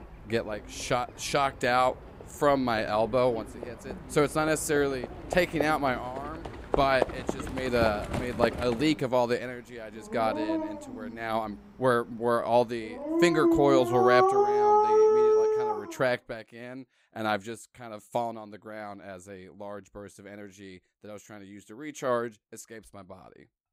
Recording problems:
animal sounds; very loud; until 16 s; 1 dB above the speech

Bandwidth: 15.5 kHz